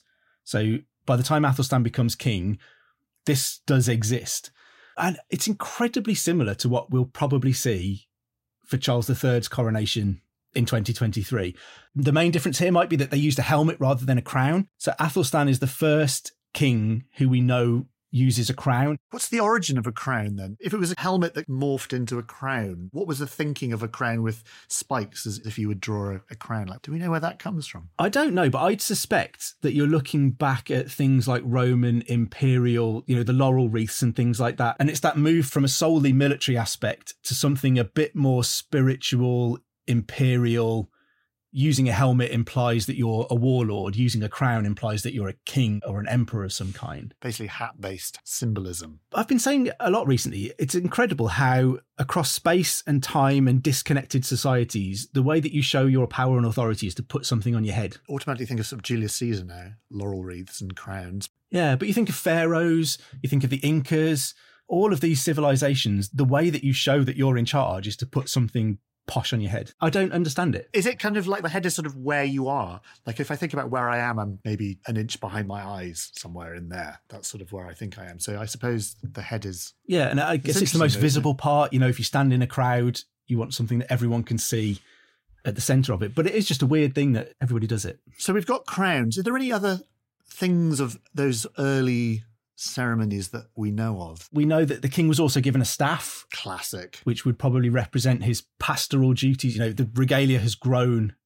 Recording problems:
none

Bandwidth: 16 kHz